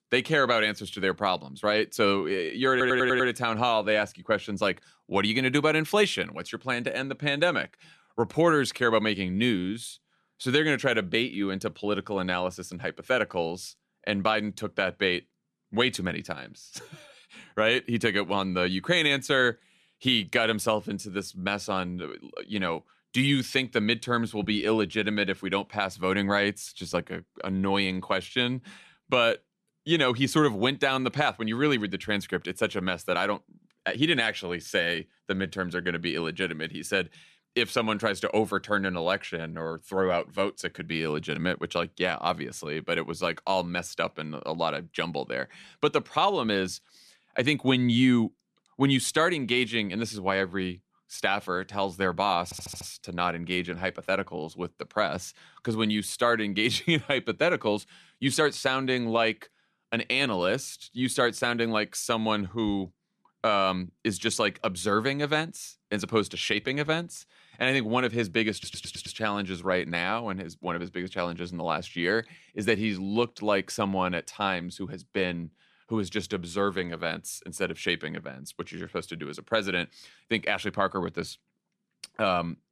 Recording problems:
audio stuttering; at 2.5 s, at 52 s and at 1:09

